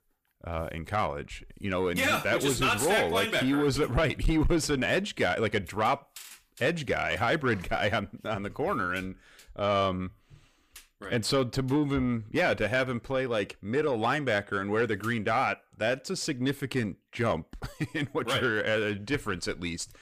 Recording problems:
distortion; slight; 10 dB below the speech

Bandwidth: 15 kHz